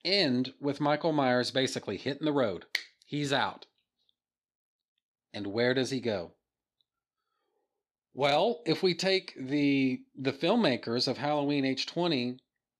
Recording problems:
none

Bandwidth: 14.5 kHz